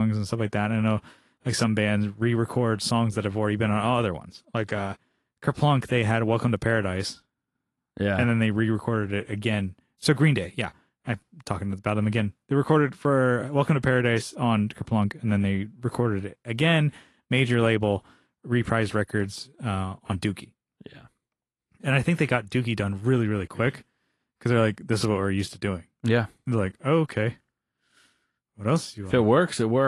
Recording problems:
garbled, watery; slightly; nothing above 11 kHz
abrupt cut into speech; at the start and the end

